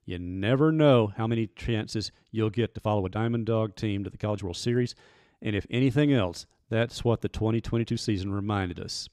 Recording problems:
uneven, jittery; strongly; from 1 to 8 s

